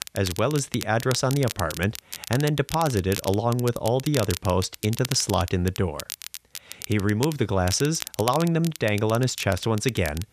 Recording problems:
crackle, like an old record; noticeable; 10 dB below the speech

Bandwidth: 14.5 kHz